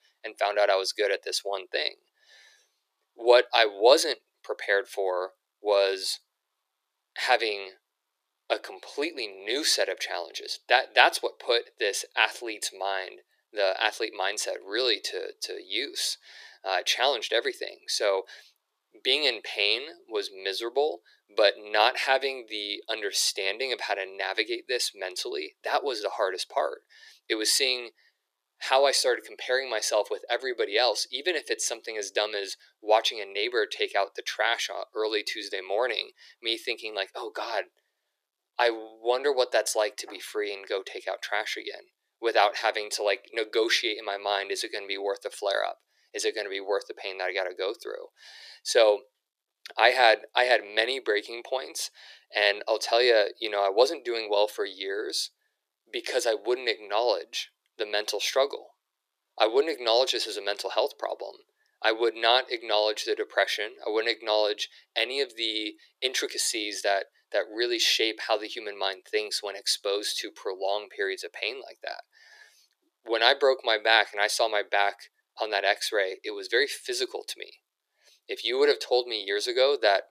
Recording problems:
thin; very; fading below 350 Hz

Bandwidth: 14.5 kHz